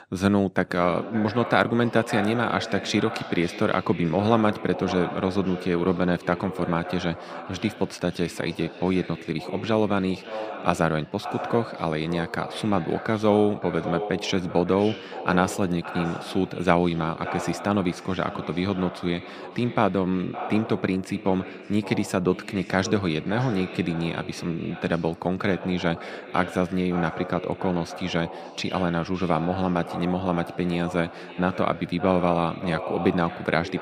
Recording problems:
echo of what is said; strong; throughout; 560 ms later, 10 dB below the speech

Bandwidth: 15.5 kHz